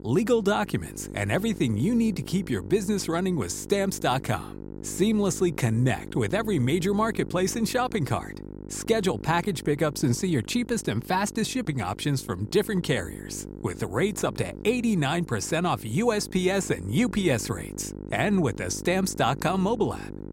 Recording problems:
electrical hum; noticeable; throughout; 50 Hz, 15 dB below the speech

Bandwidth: 16 kHz